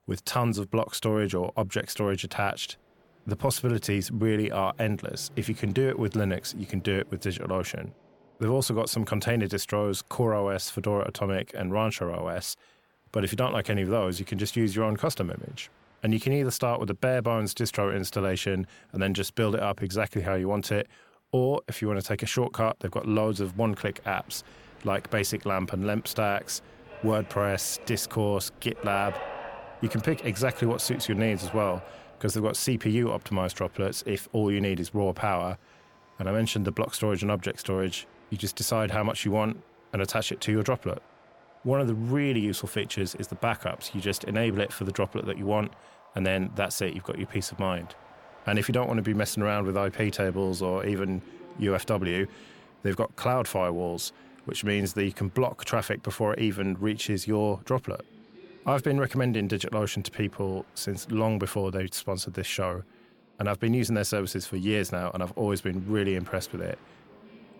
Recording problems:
train or aircraft noise; faint; throughout; 20 dB below the speech

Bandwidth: 17 kHz